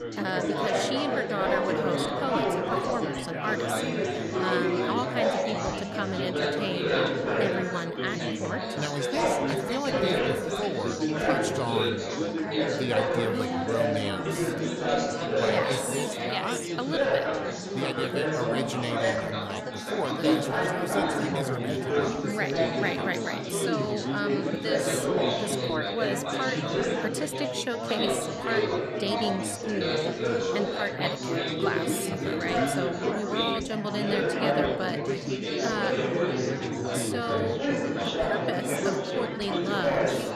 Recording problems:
chatter from many people; very loud; throughout; 5 dB above the speech

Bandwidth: 13.5 kHz